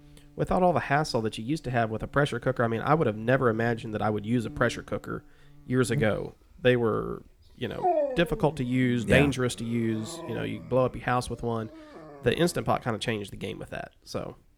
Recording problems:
animal sounds; loud; throughout; 10 dB below the speech

